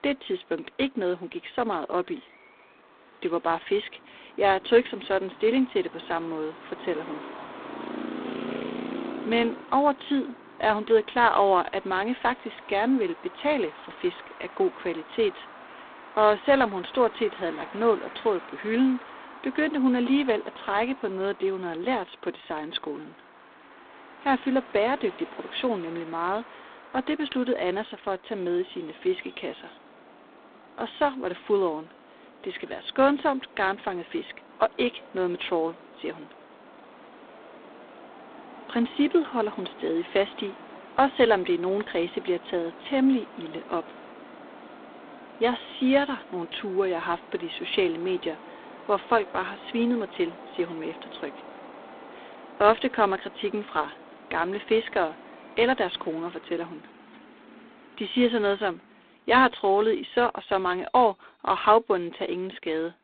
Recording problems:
phone-call audio; poor line; nothing above 3.5 kHz
traffic noise; noticeable; throughout; 20 dB below the speech

